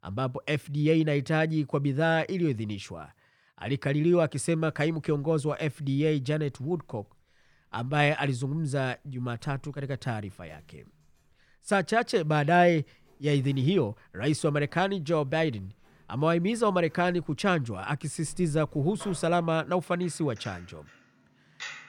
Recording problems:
household noises; faint; from 4.5 s on; 25 dB below the speech

